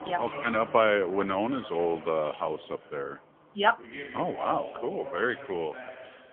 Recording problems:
phone-call audio; poor line; nothing above 3.5 kHz
household noises; noticeable; throughout; 15 dB below the speech
voice in the background; noticeable; throughout; 15 dB below the speech

